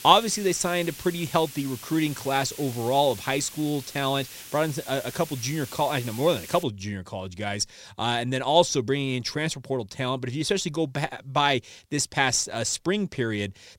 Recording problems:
hiss; noticeable; until 6.5 s; 15 dB below the speech

